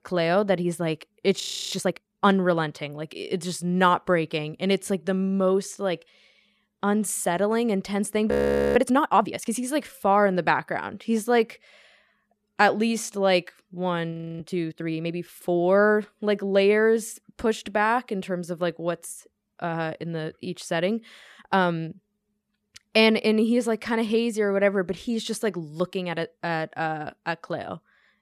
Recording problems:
audio freezing; at 1.5 s, at 8.5 s and at 14 s

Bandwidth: 14.5 kHz